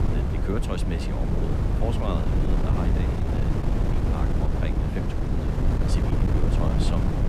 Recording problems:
wind noise on the microphone; heavy; 3 dB above the speech

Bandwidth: 15 kHz